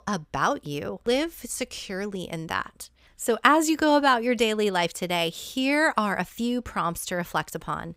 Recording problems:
none

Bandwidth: 15.5 kHz